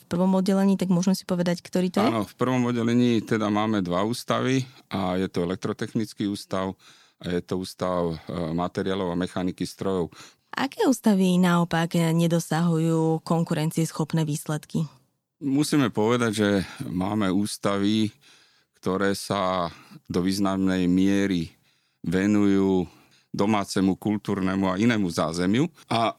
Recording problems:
none

